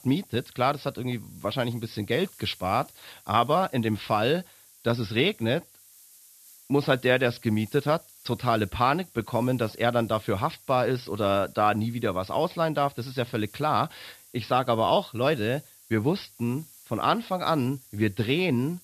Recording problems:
high frequencies cut off; noticeable; nothing above 5.5 kHz
hiss; faint; throughout; 25 dB below the speech

